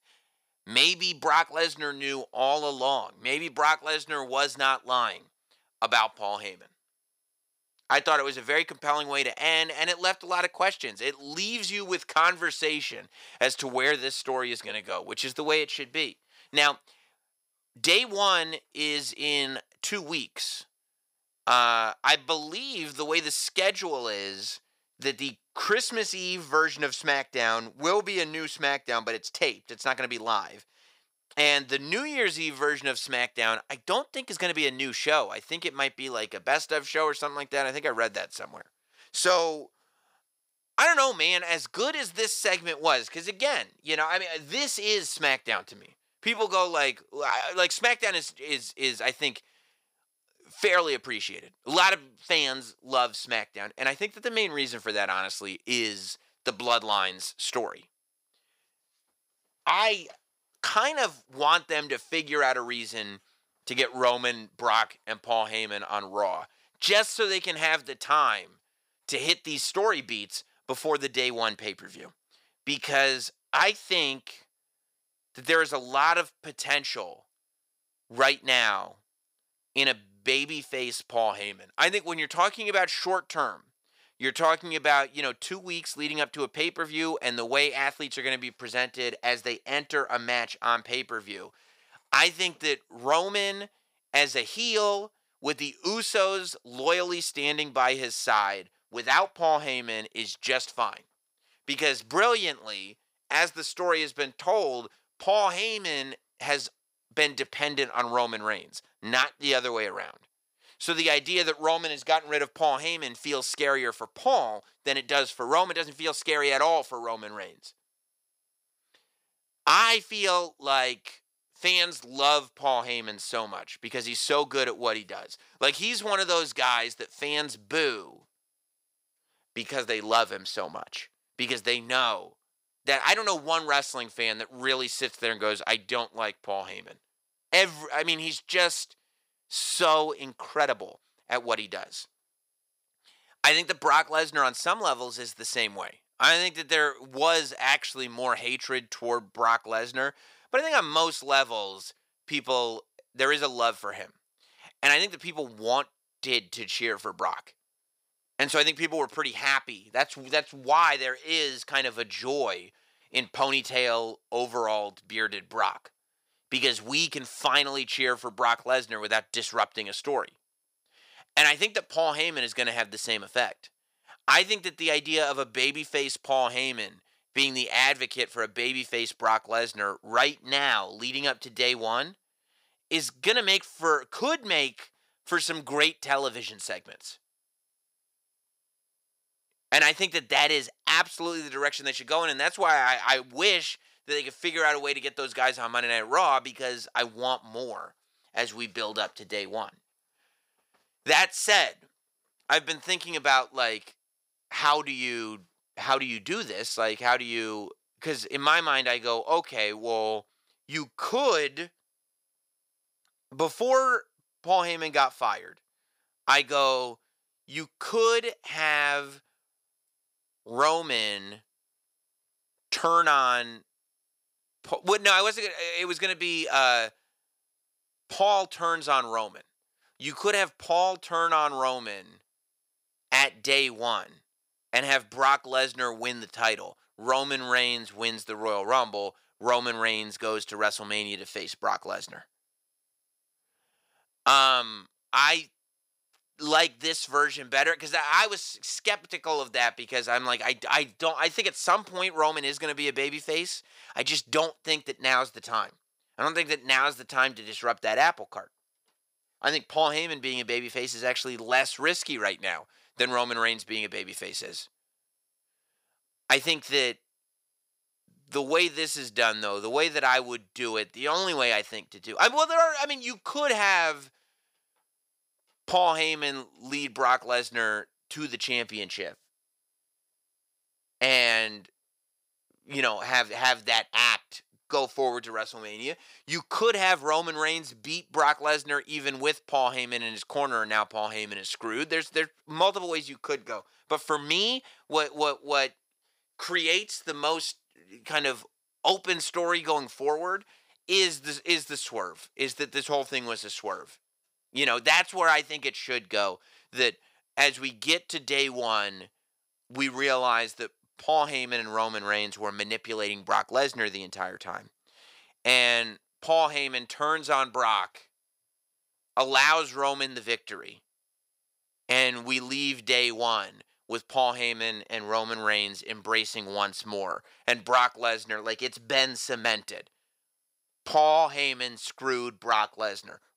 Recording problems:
thin; somewhat; fading below 450 Hz

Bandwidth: 15.5 kHz